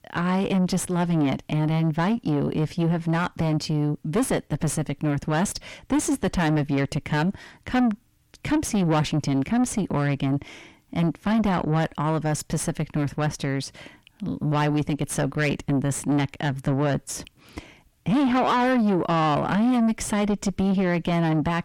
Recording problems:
distortion; heavy; 6 dB below the speech

